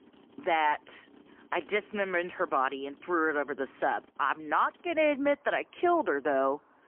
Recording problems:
phone-call audio; poor line; nothing above 3 kHz
traffic noise; faint; throughout; 30 dB below the speech

